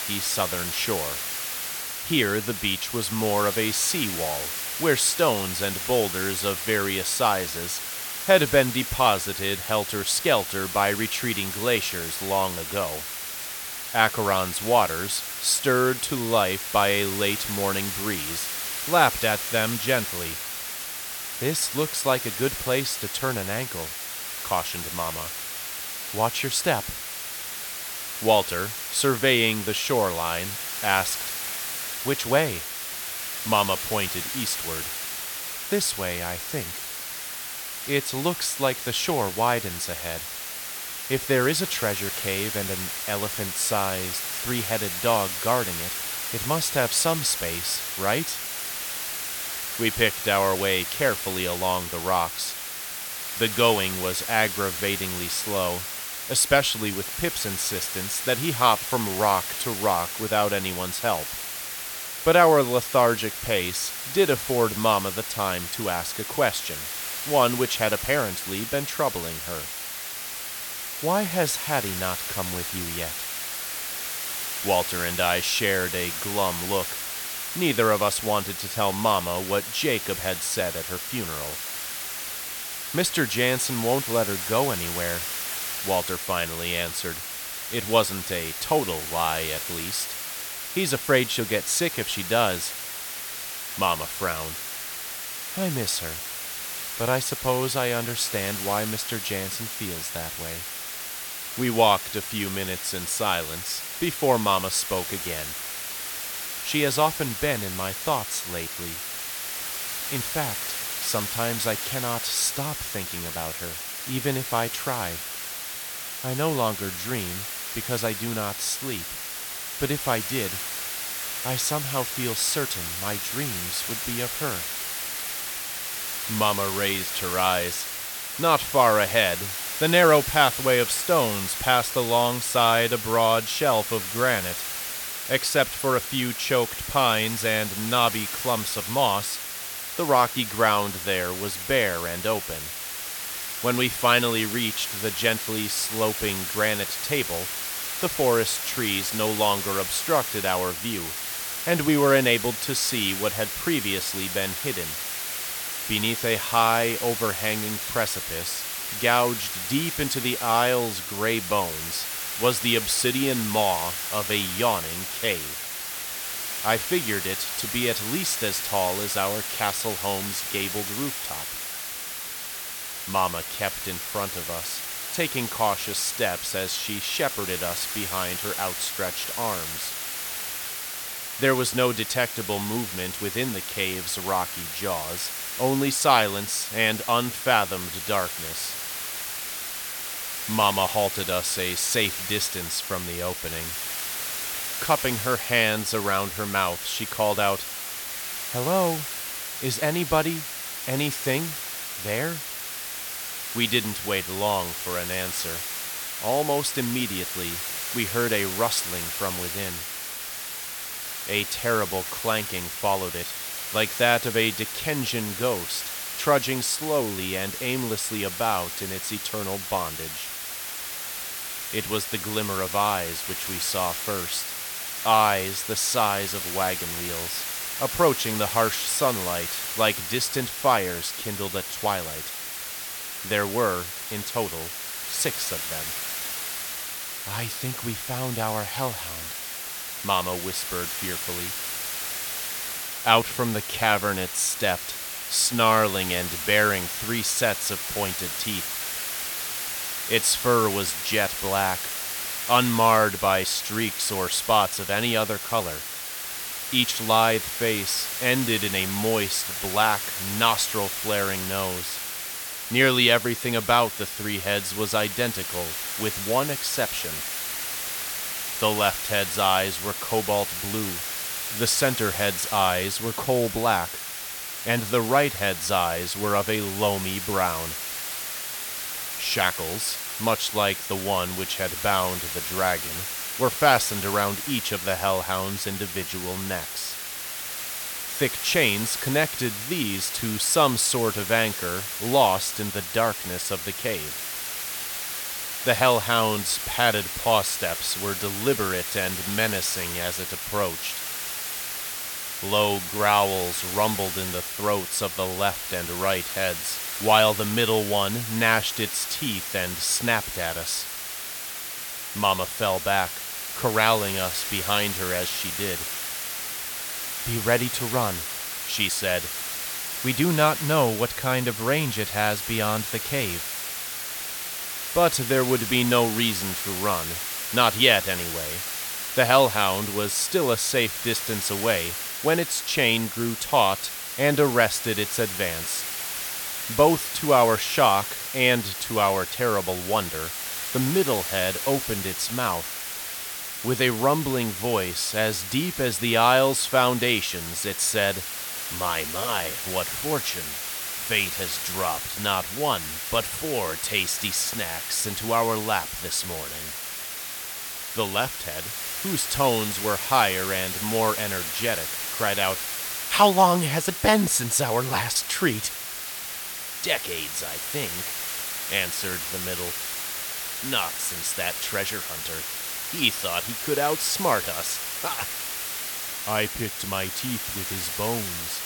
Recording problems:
hiss; loud; throughout; 4 dB below the speech

